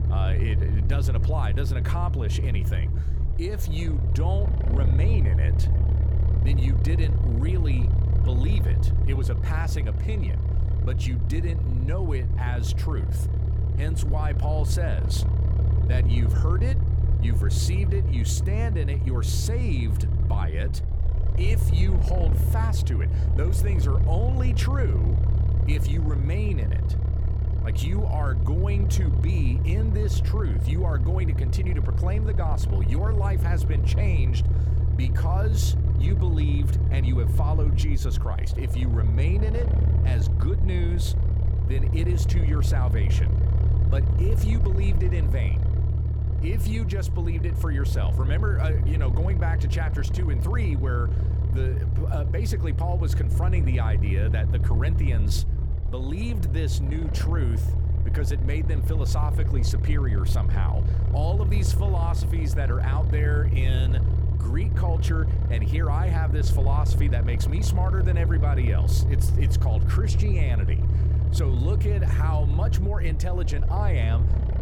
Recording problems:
low rumble; loud; throughout; 3 dB below the speech

